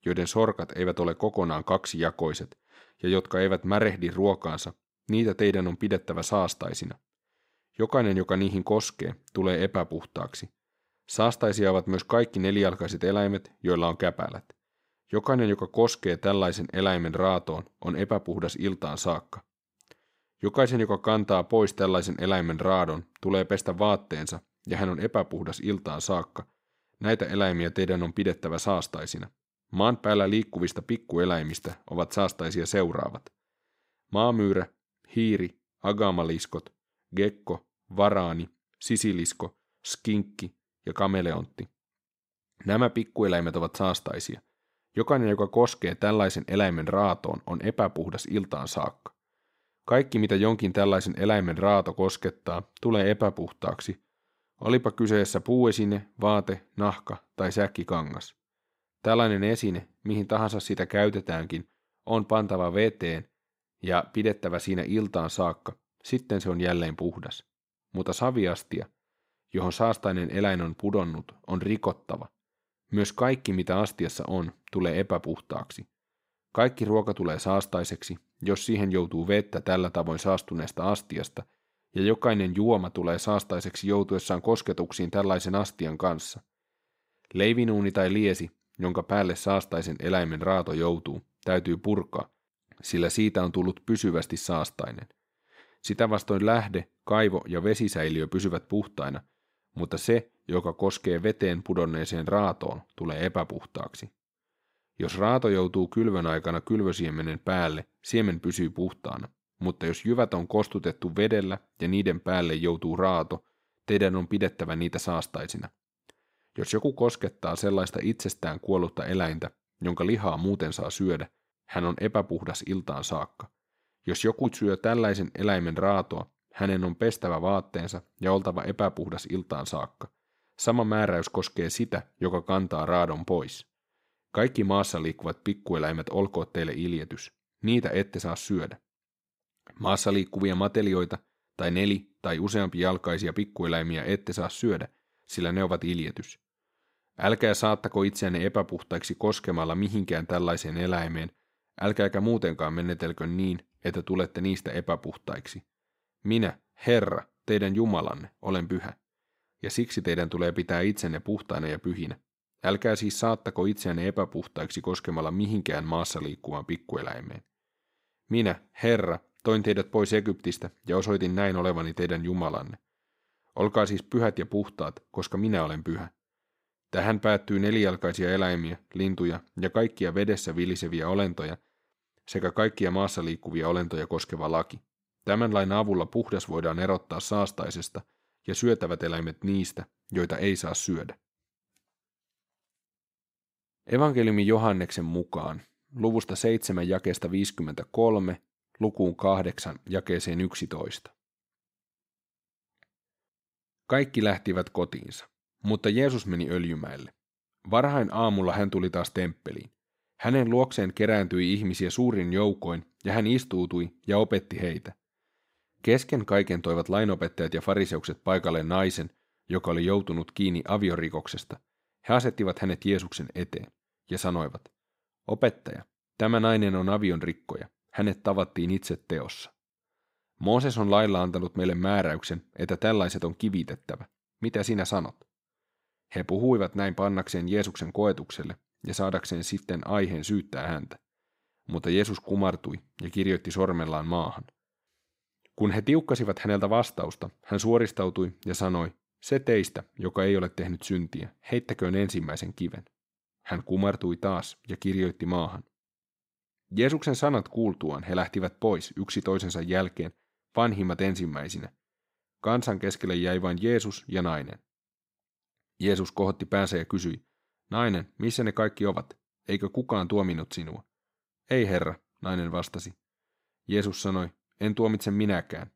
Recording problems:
crackling; faint; at 31 s; 25 dB below the speech

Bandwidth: 15.5 kHz